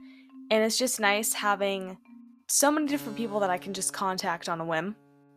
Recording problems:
background music; faint; throughout; 20 dB below the speech

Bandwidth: 14.5 kHz